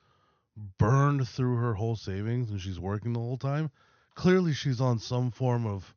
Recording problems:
high frequencies cut off; noticeable; nothing above 6.5 kHz

